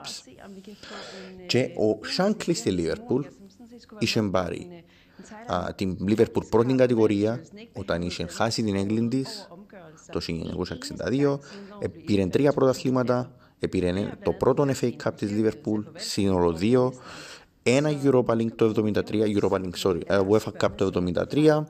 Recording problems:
voice in the background; faint; throughout; 20 dB below the speech

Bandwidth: 14.5 kHz